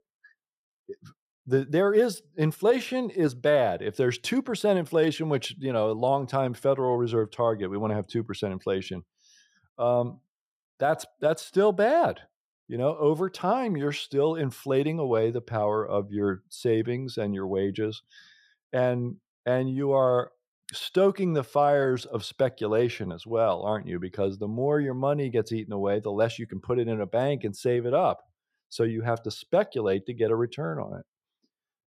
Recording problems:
none

